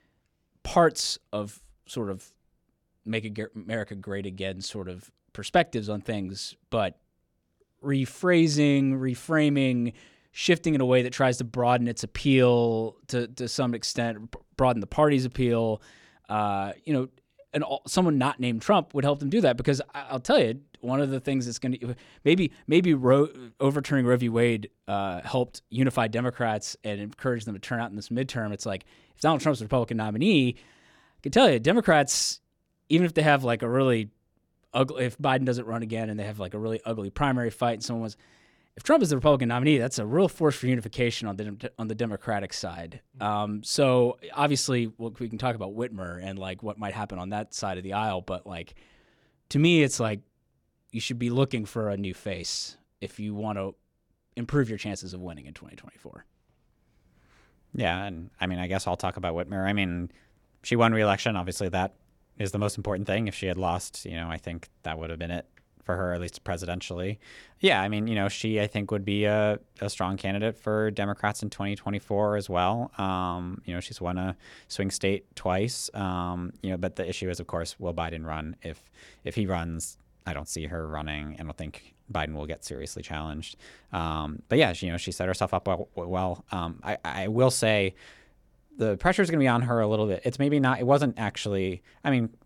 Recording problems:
none

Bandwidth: 18 kHz